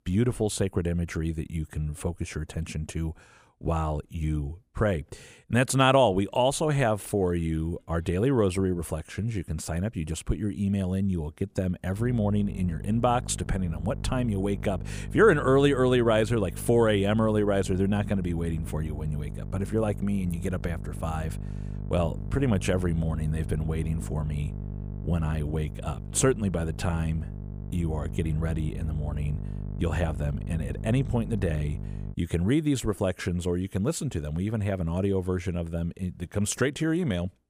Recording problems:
electrical hum; noticeable; from 12 to 32 s; 50 Hz, 20 dB below the speech

